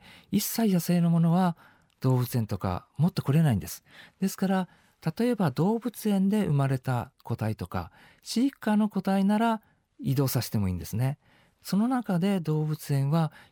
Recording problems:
none

